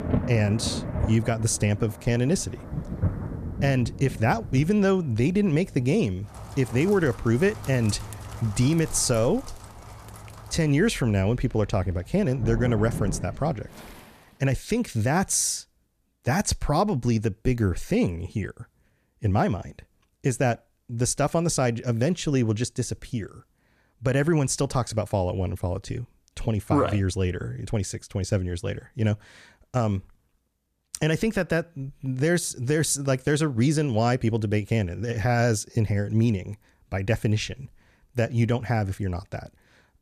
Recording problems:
rain or running water; noticeable; until 14 s; 10 dB below the speech

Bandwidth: 14.5 kHz